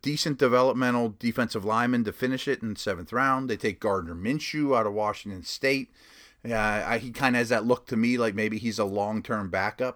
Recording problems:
none

